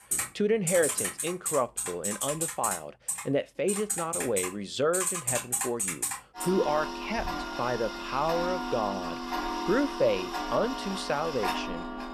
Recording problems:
household noises; loud; throughout; 2 dB below the speech

